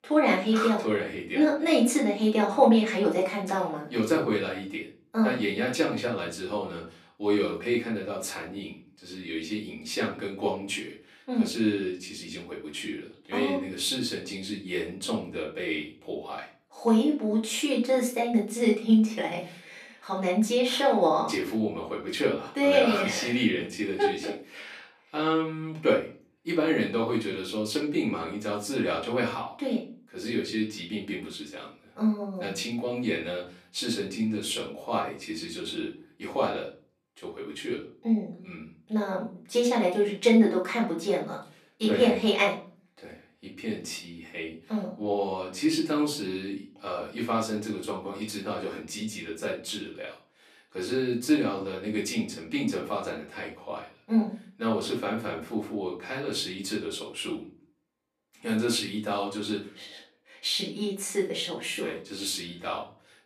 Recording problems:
off-mic speech; far
room echo; slight; dies away in 0.3 s
thin; very slightly; fading below 400 Hz

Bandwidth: 14.5 kHz